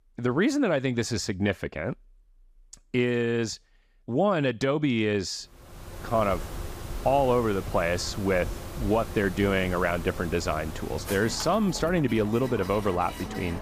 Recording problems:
machinery noise; noticeable; from 6 s on; 10 dB below the speech

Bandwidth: 15 kHz